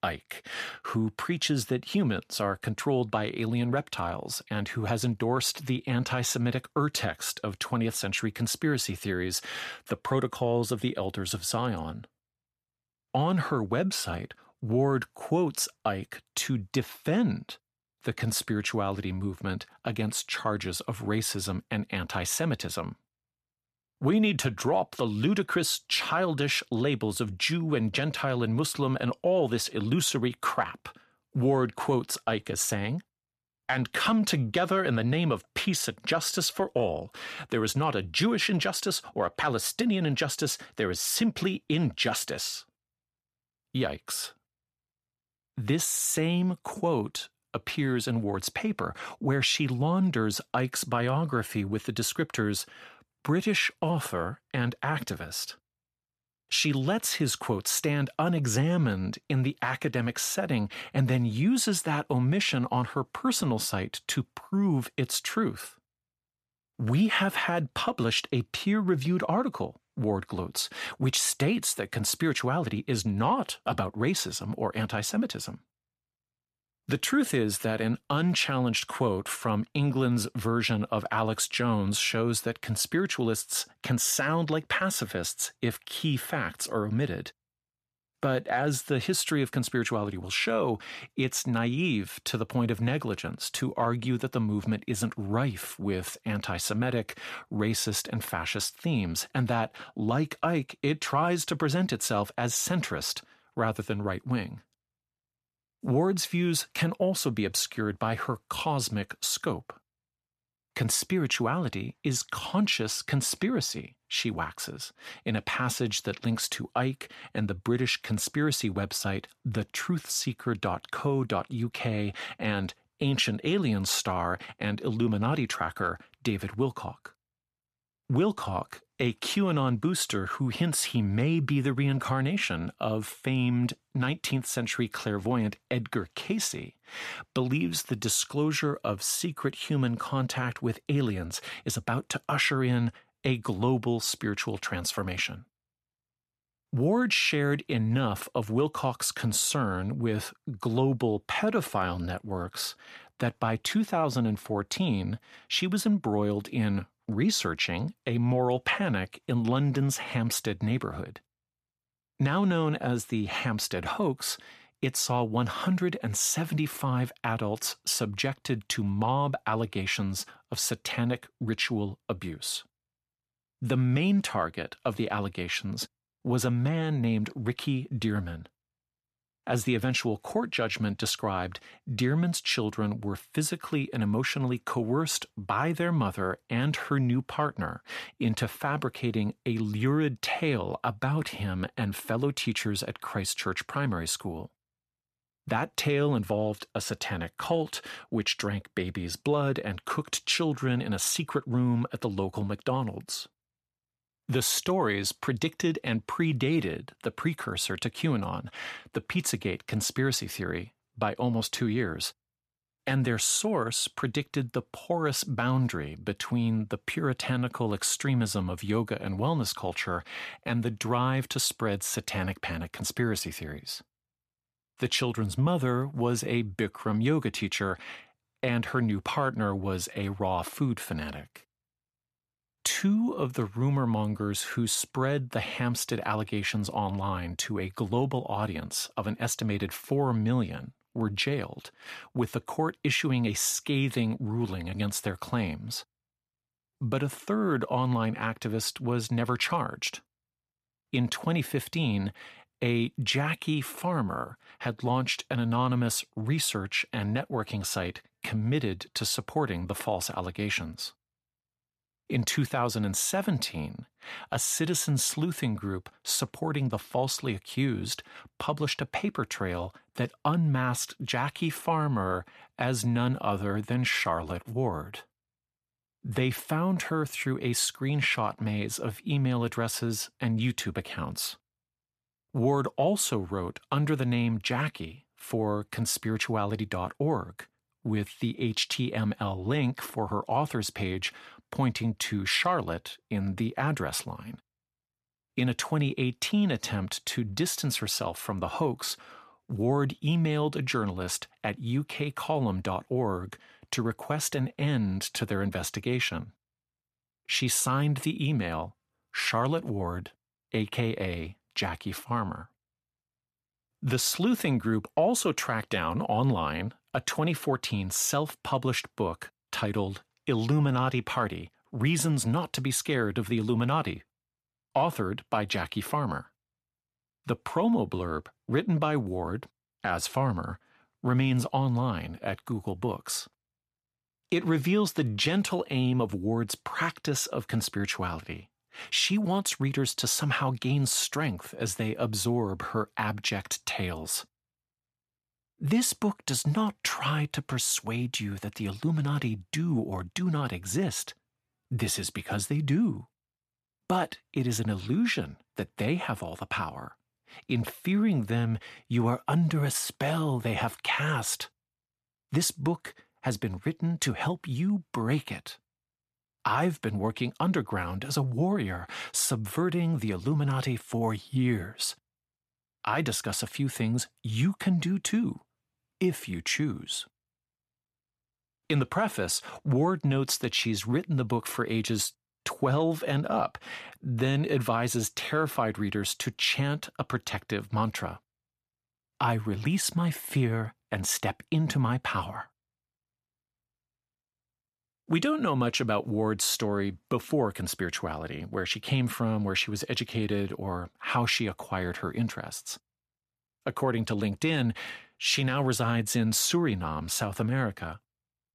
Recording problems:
none

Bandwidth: 14.5 kHz